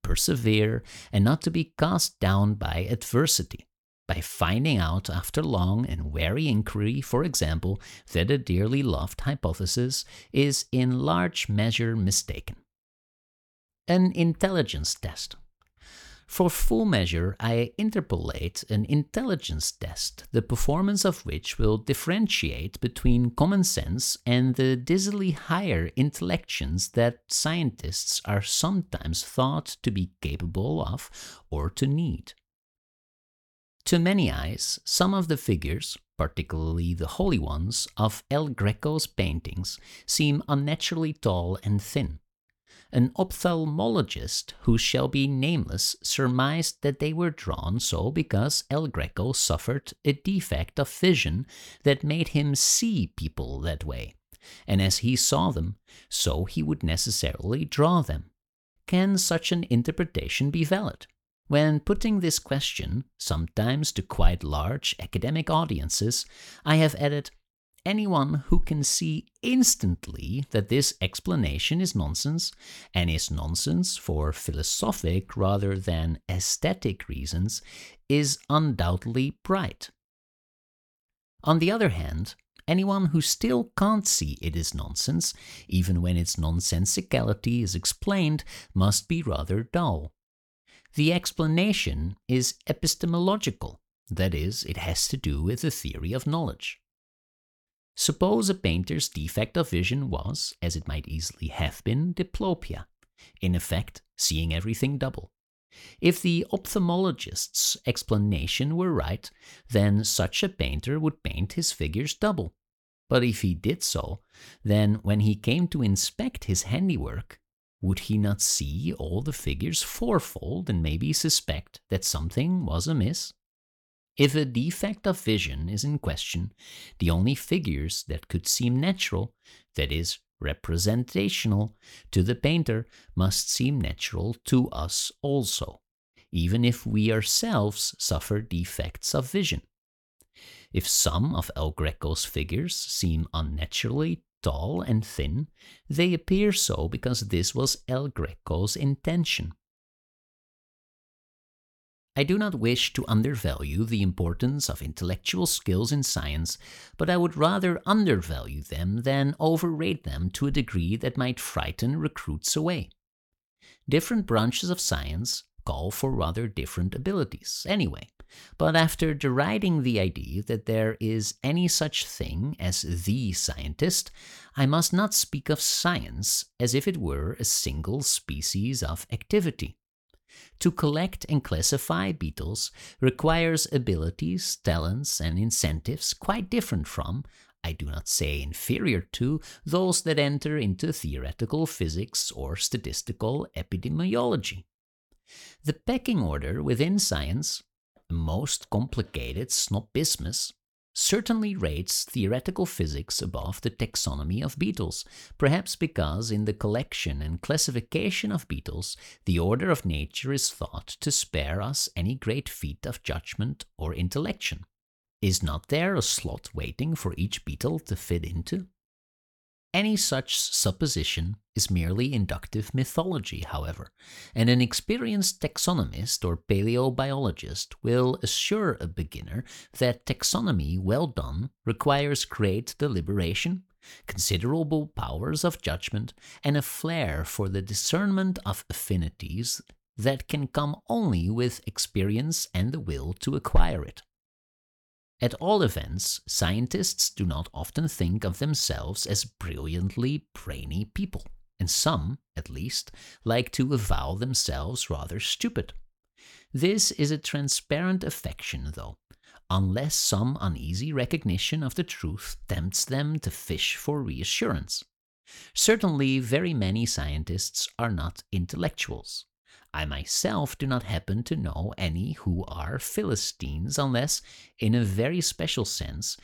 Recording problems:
none

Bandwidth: 18 kHz